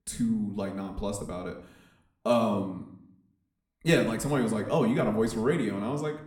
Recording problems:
room echo; slight; dies away in 0.6 s
off-mic speech; somewhat distant

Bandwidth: 17 kHz